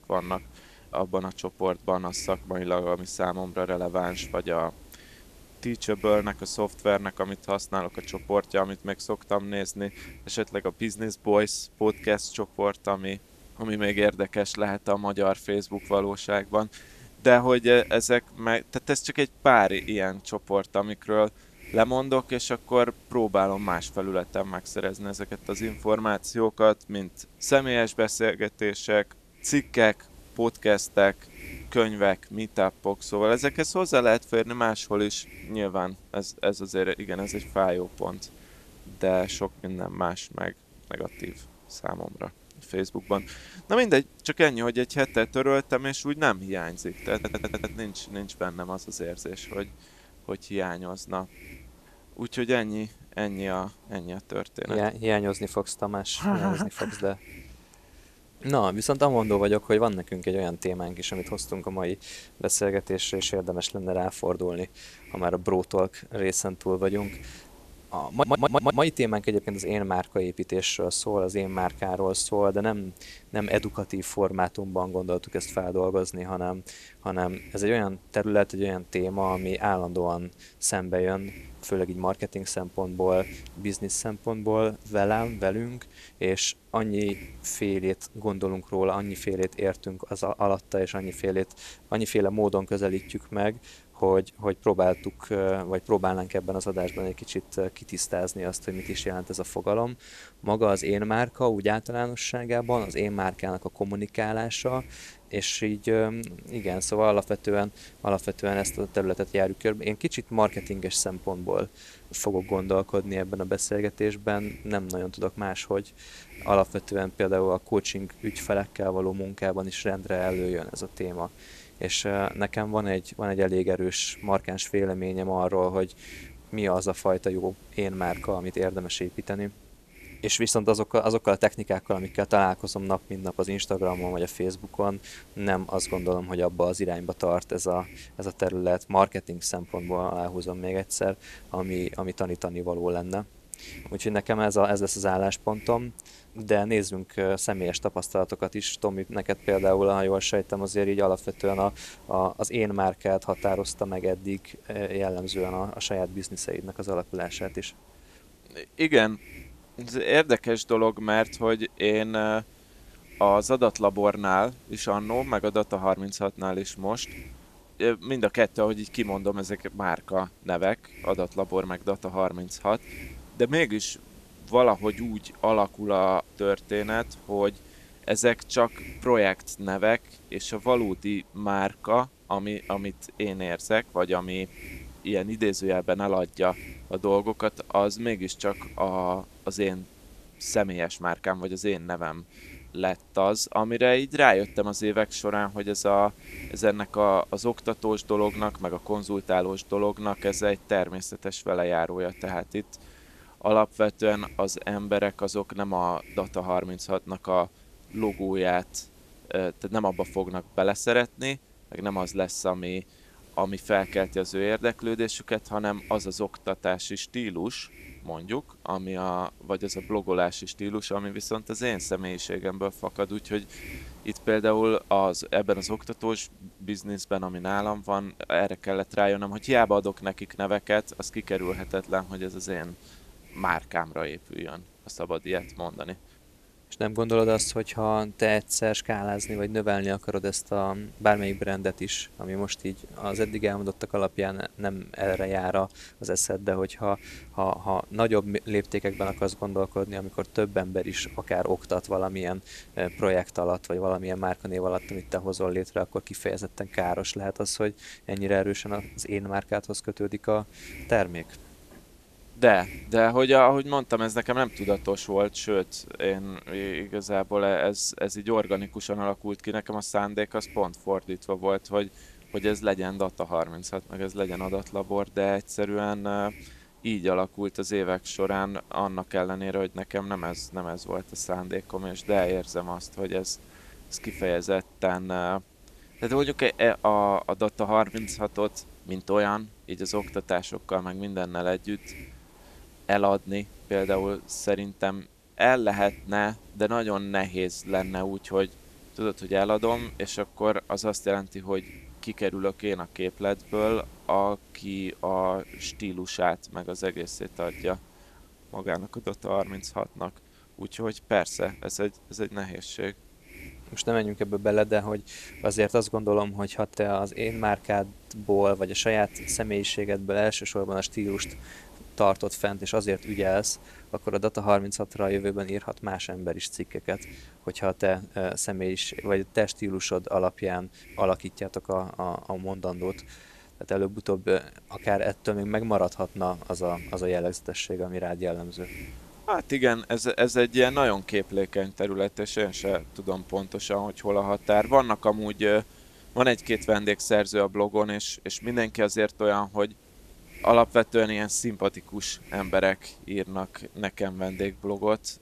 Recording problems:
hiss; faint; throughout; 20 dB below the speech
audio stuttering; at 47 s and at 1:08

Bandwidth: 14 kHz